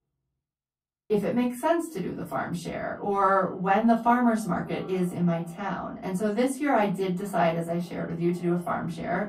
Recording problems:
off-mic speech; far
echo of what is said; faint; throughout; 500 ms later, 25 dB below the speech
room echo; very slight; dies away in 0.3 s

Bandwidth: 15.5 kHz